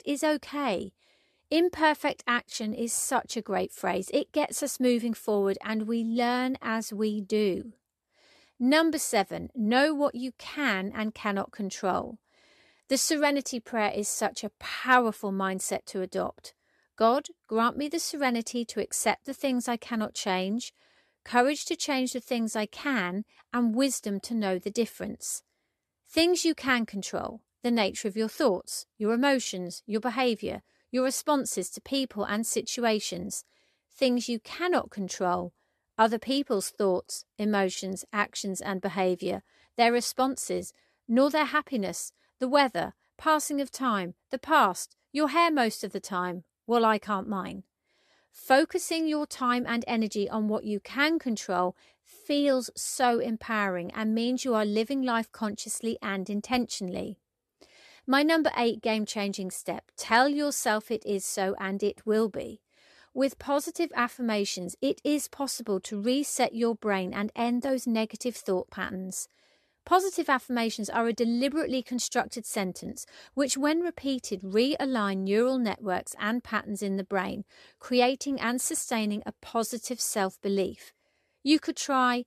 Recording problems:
none

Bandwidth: 13.5 kHz